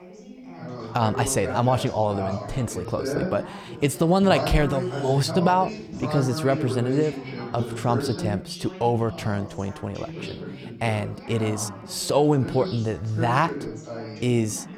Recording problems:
background chatter; loud; throughout; 3 voices, 8 dB below the speech

